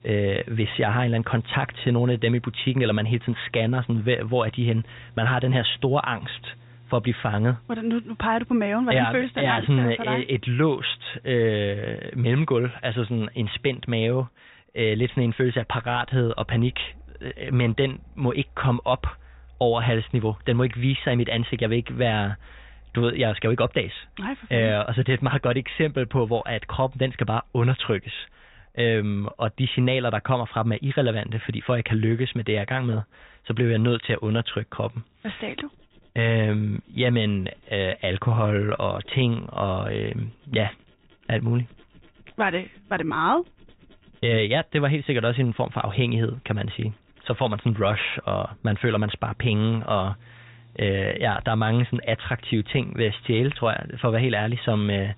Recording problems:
high frequencies cut off; severe; nothing above 4 kHz
machinery noise; faint; throughout; 25 dB below the speech

